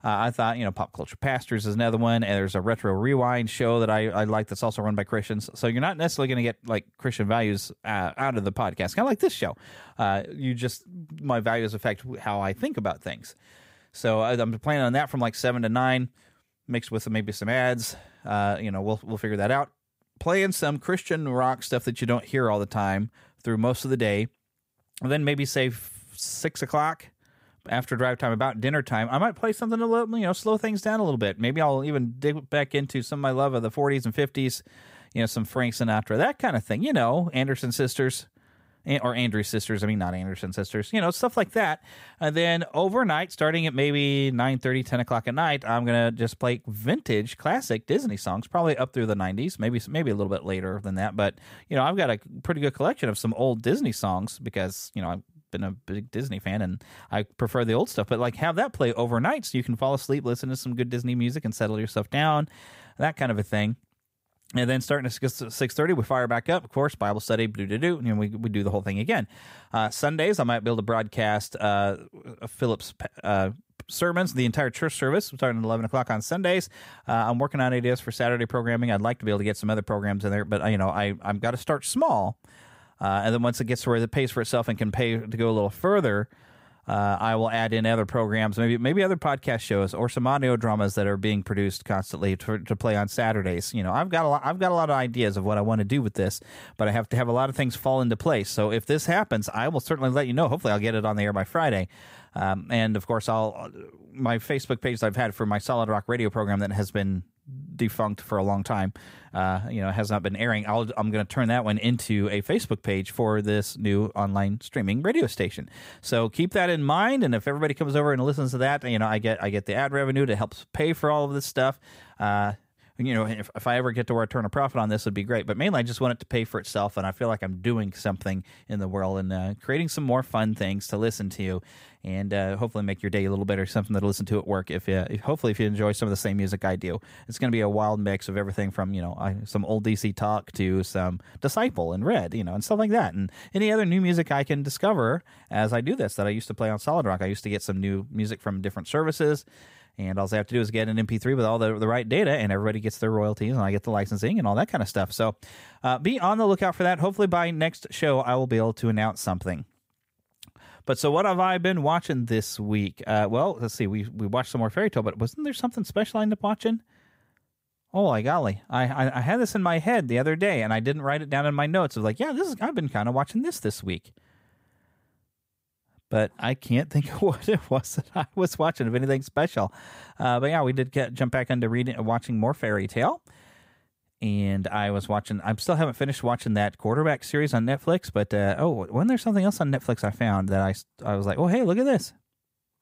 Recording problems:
none

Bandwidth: 15.5 kHz